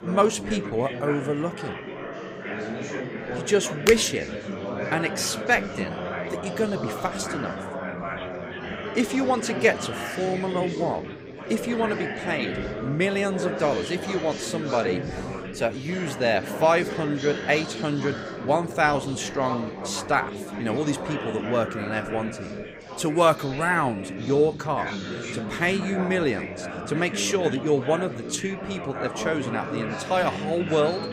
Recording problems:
chatter from many people; loud; throughout; 7 dB below the speech

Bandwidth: 15.5 kHz